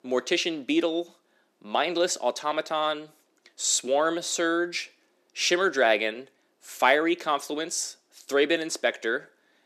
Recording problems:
thin; somewhat; fading below 300 Hz

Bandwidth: 14.5 kHz